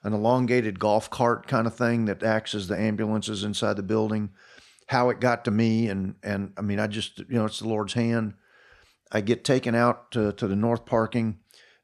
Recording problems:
none

